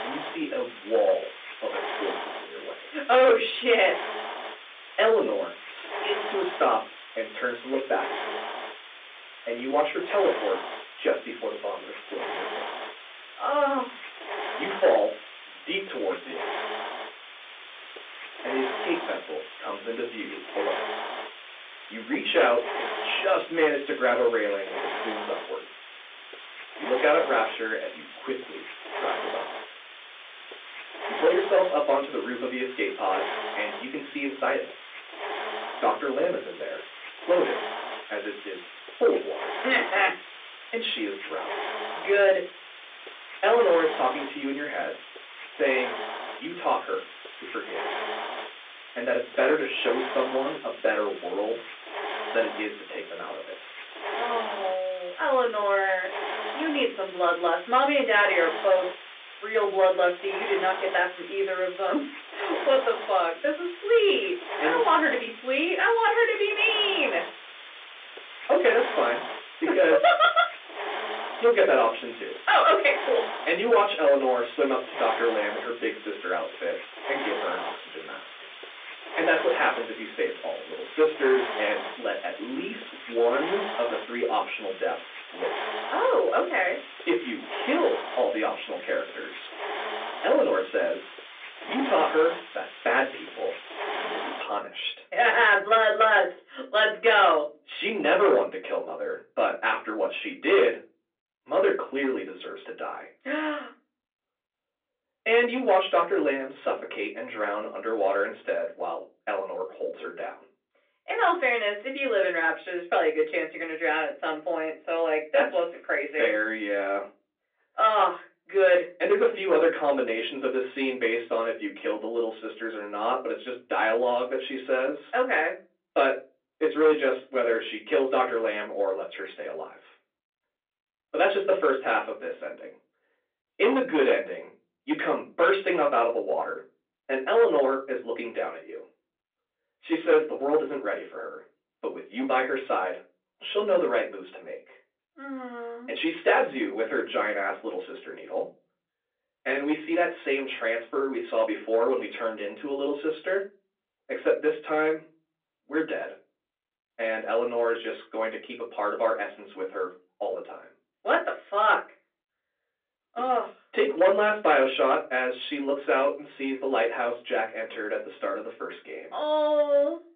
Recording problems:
off-mic speech; far
phone-call audio
distortion; slight; 10 dB below the speech
room echo; very slight; dies away in 0.3 s
hiss; noticeable; until 1:34; 10 dB below the speech

